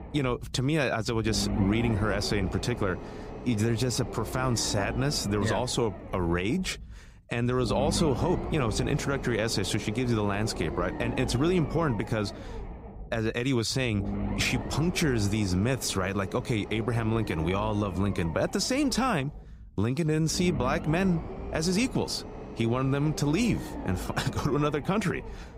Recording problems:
low rumble; noticeable; throughout; 10 dB below the speech

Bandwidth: 15.5 kHz